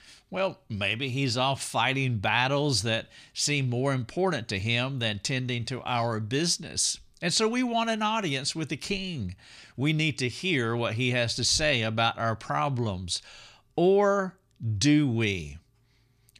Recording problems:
none

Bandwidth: 14.5 kHz